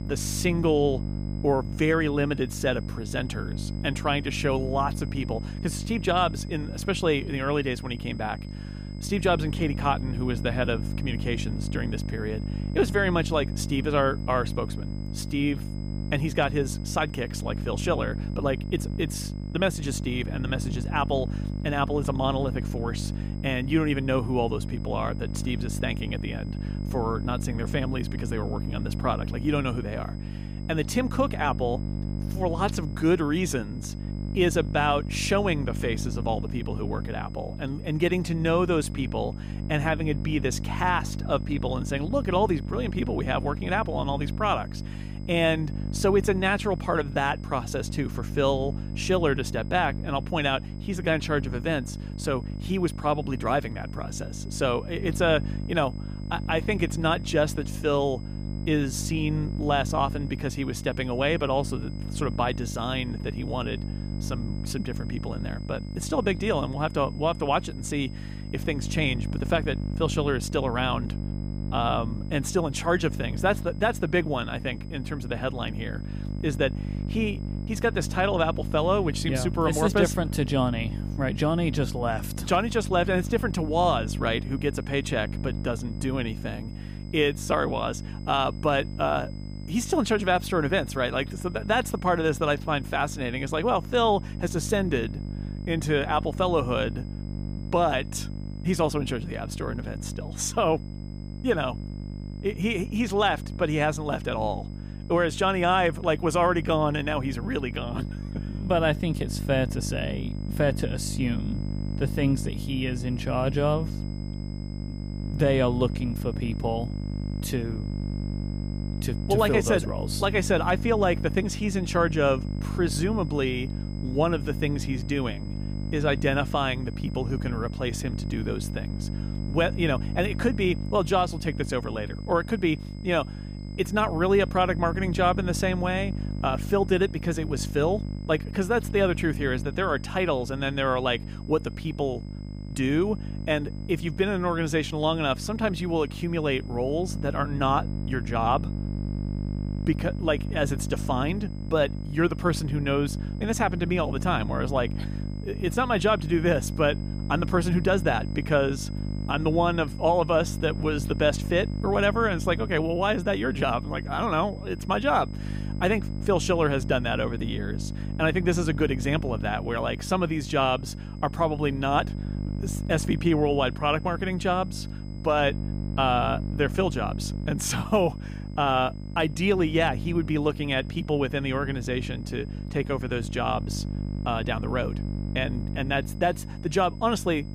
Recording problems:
electrical hum; noticeable; throughout; 50 Hz, 15 dB below the speech
high-pitched whine; faint; throughout; 5 kHz, 30 dB below the speech

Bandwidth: 15 kHz